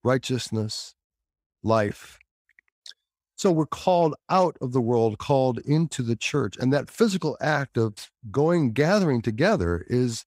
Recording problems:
none

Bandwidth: 15.5 kHz